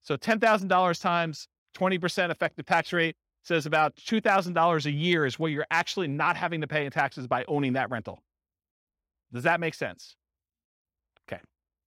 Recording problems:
none

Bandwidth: 16 kHz